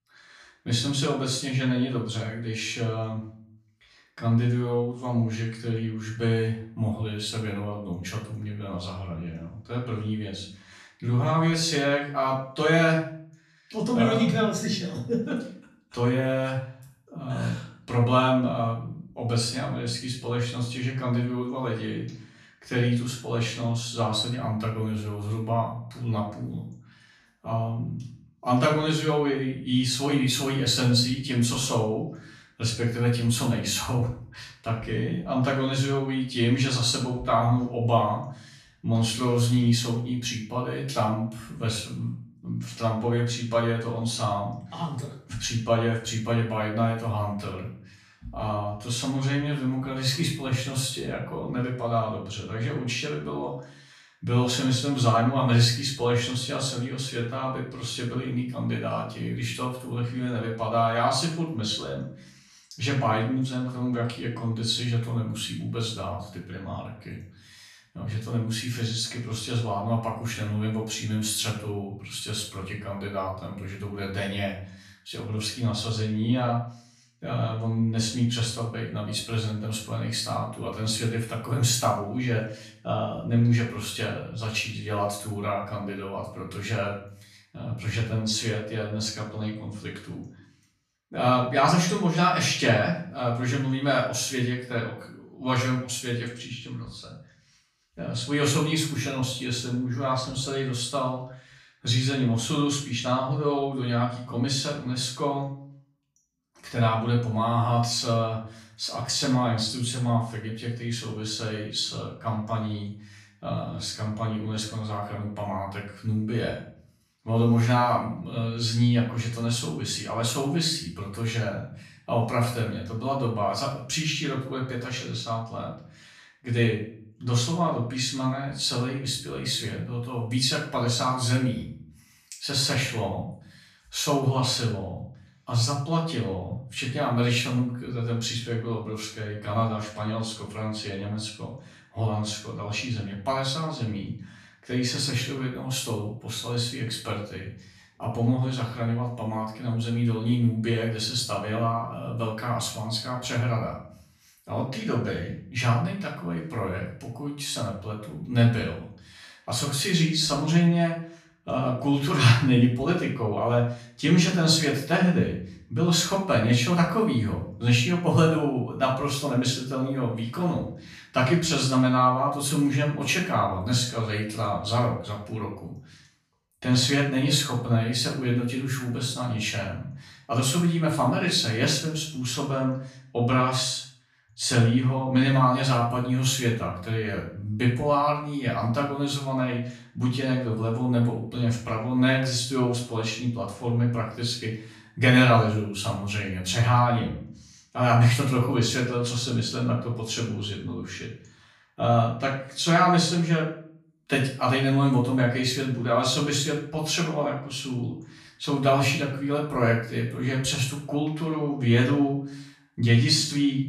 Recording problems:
off-mic speech; far
room echo; noticeable; dies away in 0.4 s

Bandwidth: 14.5 kHz